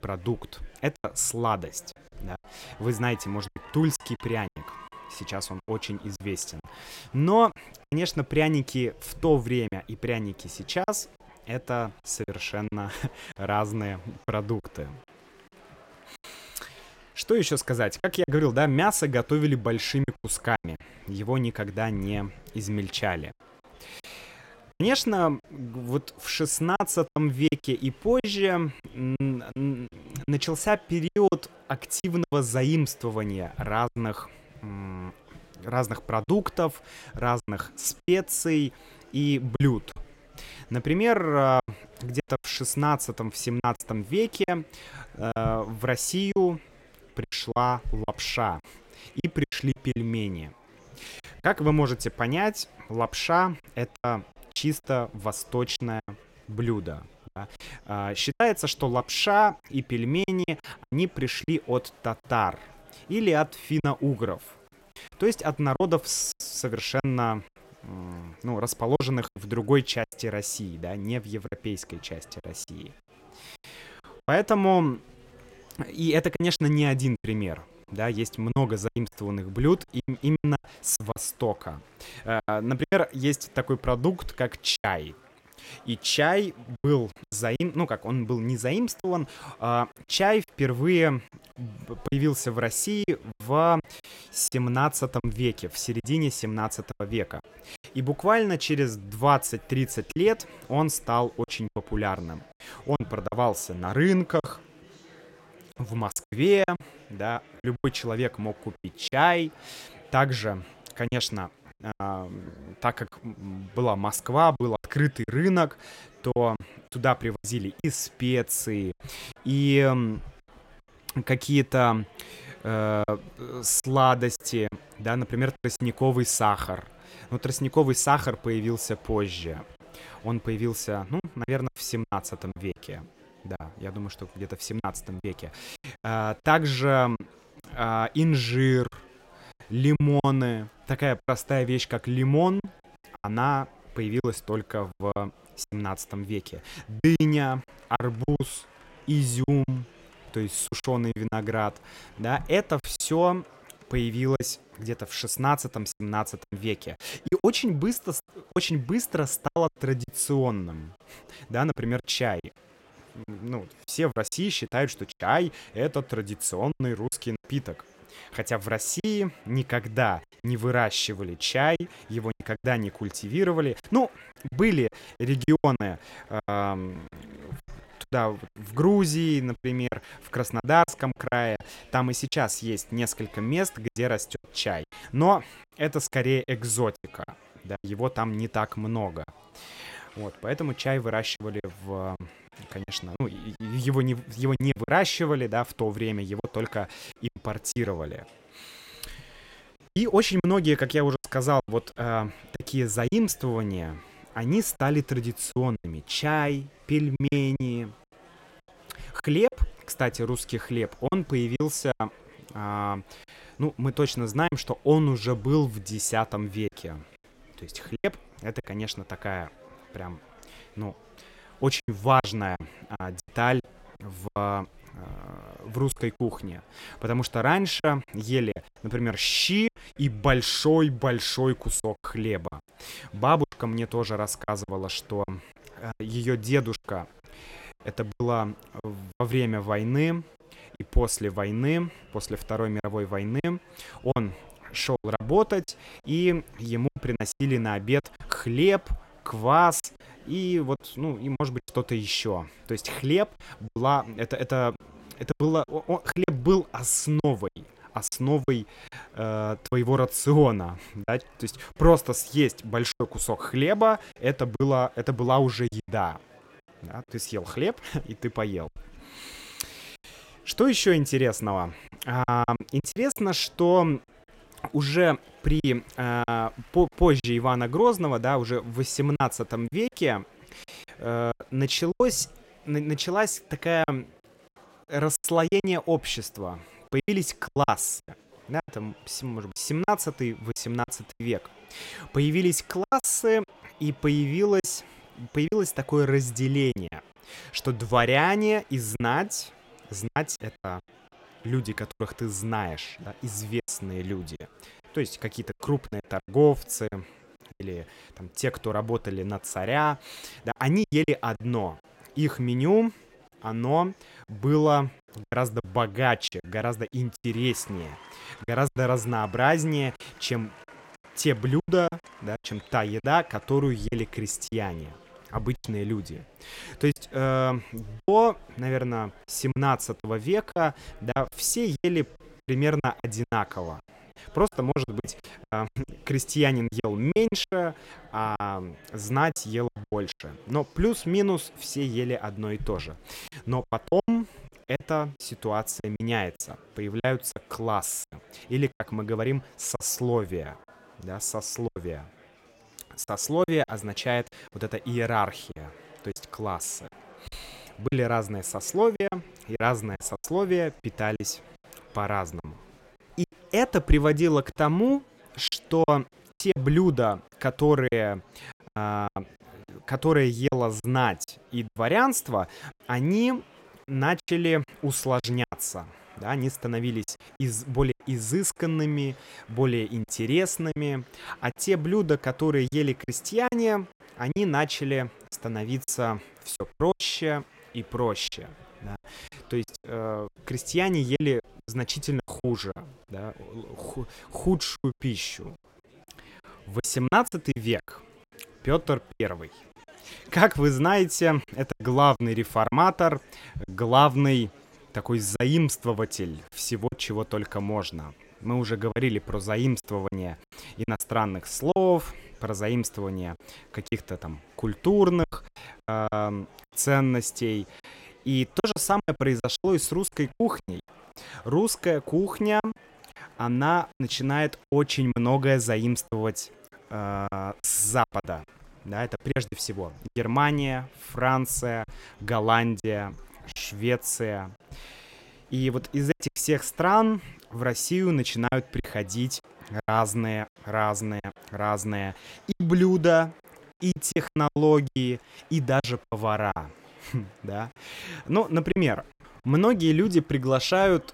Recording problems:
chatter from many people; faint; throughout; 25 dB below the speech
choppy; very; 8% of the speech affected

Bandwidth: 16 kHz